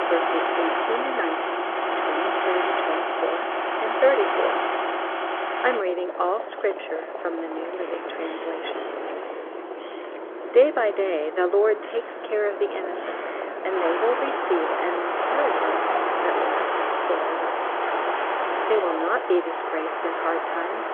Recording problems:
phone-call audio; nothing above 3.5 kHz
traffic noise; very loud; throughout; as loud as the speech

